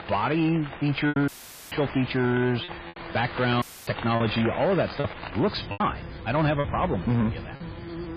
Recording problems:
garbled, watery; badly
distortion; slight; 10 dB below the speech
electrical hum; noticeable; throughout; 50 Hz, 20 dB below the speech
rain or running water; noticeable; throughout; 10 dB below the speech
choppy; very; from 1 to 5 s and at 5.5 s; 6% of the speech affected
audio cutting out; filled with static; at 1.5 s and at 3.5 s

